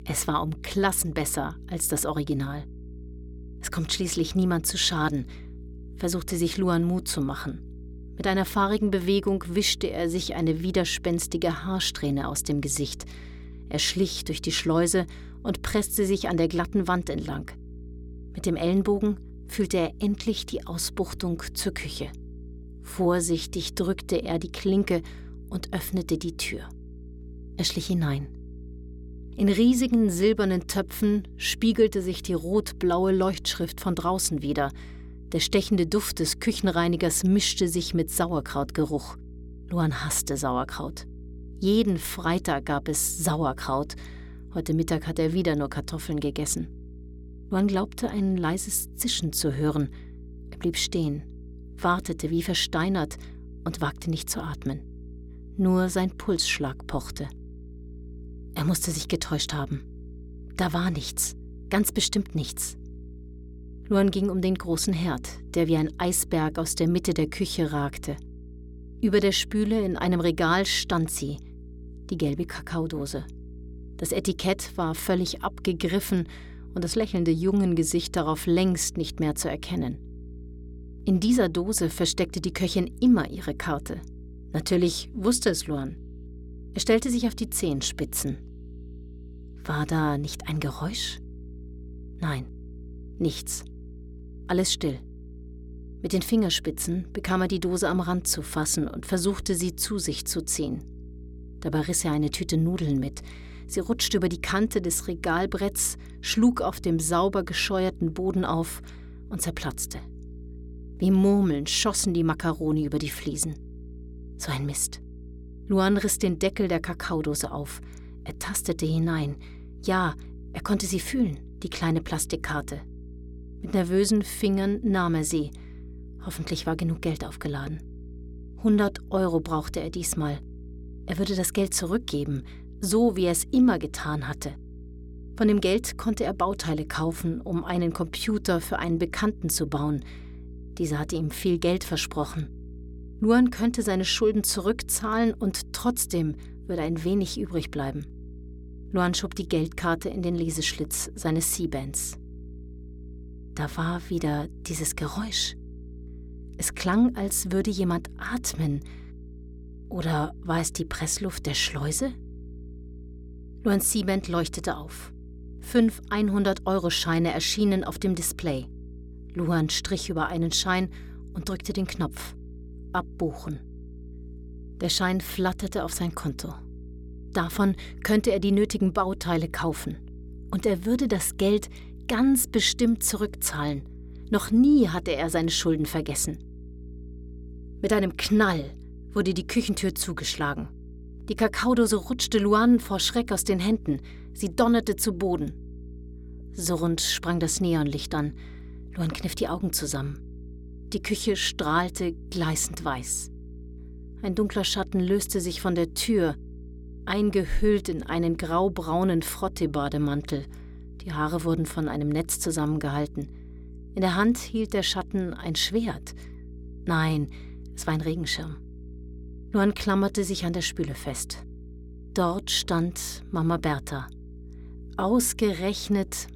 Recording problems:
electrical hum; faint; throughout; 60 Hz, 25 dB below the speech

